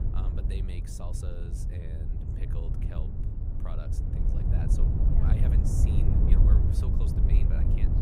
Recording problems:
wind noise on the microphone; heavy; 5 dB above the speech
voice in the background; faint; throughout; 30 dB below the speech

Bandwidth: 15.5 kHz